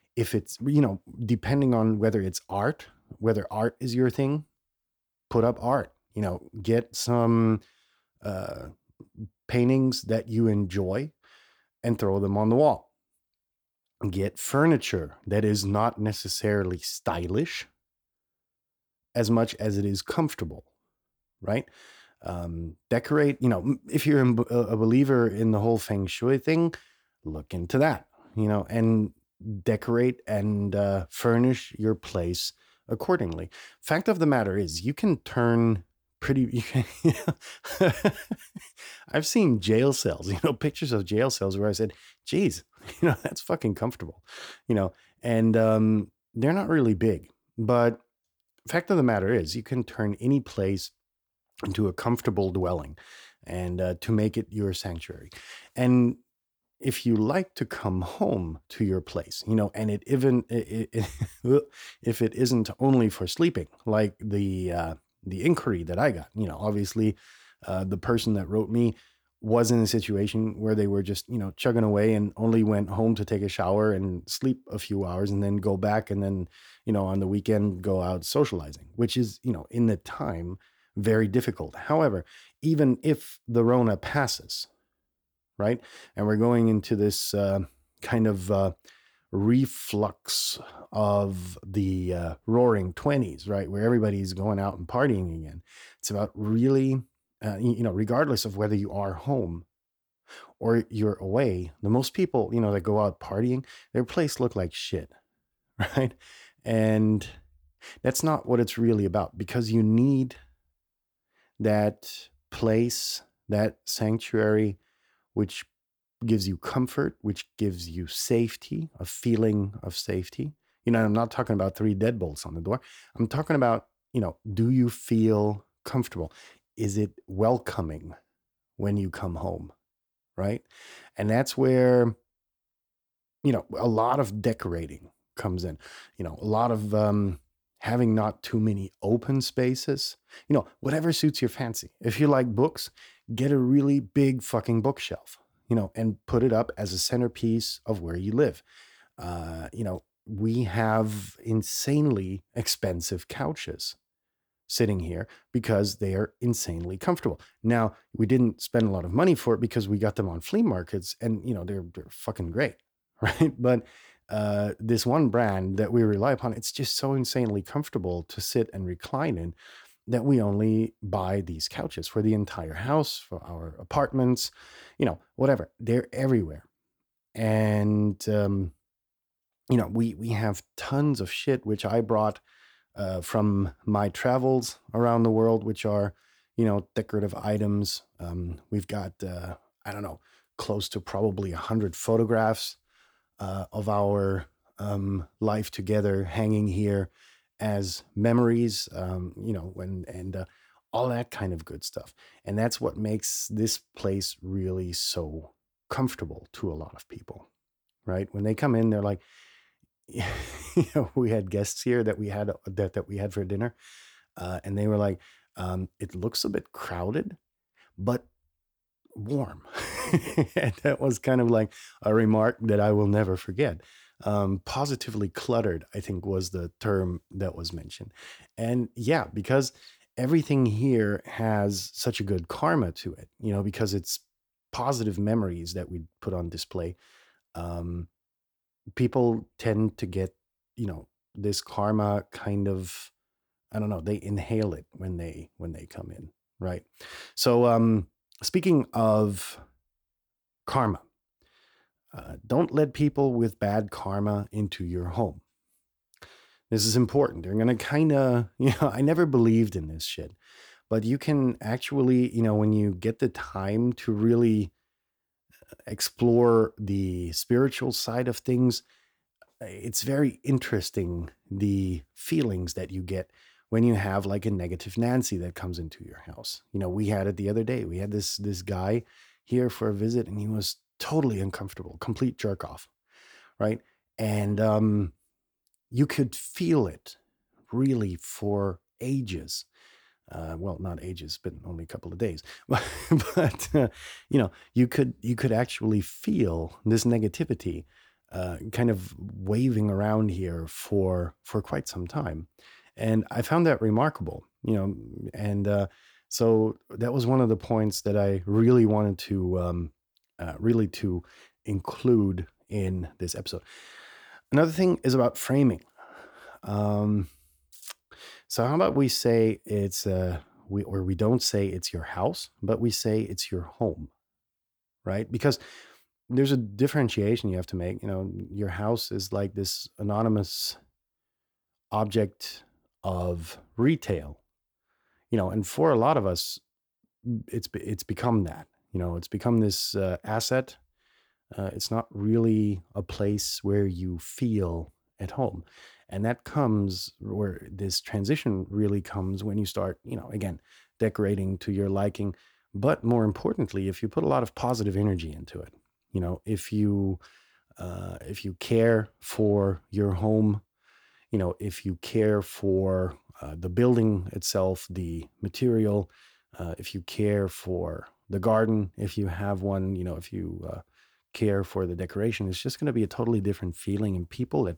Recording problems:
none

